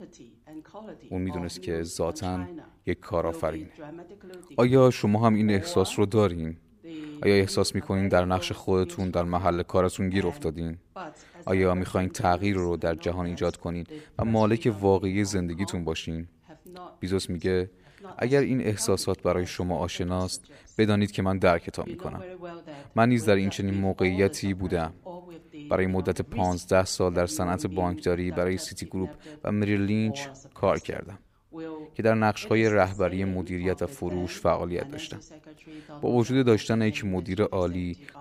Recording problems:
voice in the background; noticeable; throughout; 15 dB below the speech

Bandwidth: 15 kHz